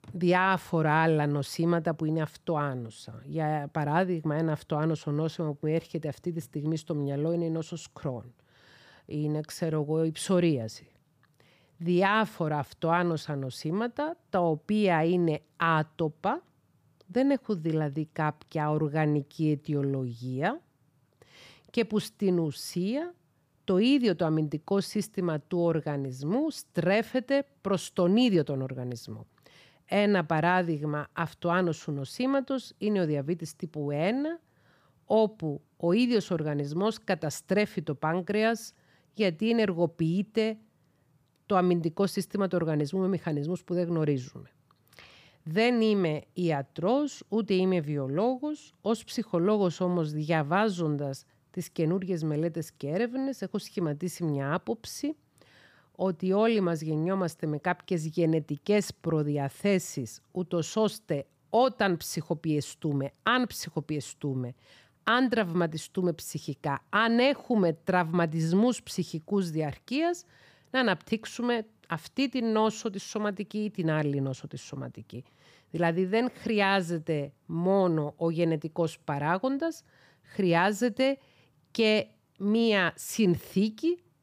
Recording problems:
none

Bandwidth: 15 kHz